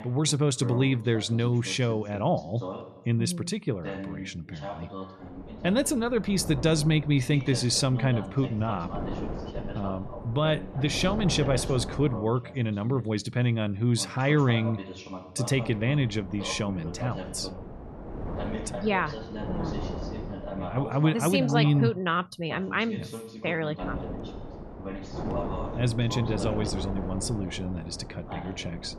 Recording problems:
voice in the background; noticeable; throughout; 15 dB below the speech
wind noise on the microphone; occasional gusts; from 5 to 12 s, from 16 to 21 s and from 24 s on; 10 dB below the speech

